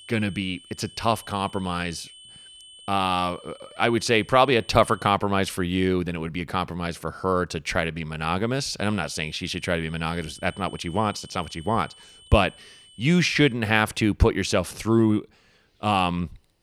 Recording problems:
high-pitched whine; faint; until 5 s and from 9 to 14 s; 3 kHz, 20 dB below the speech

